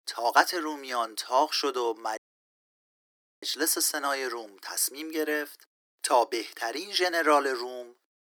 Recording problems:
thin; somewhat; fading below 300 Hz
audio cutting out; at 2 s for 1.5 s

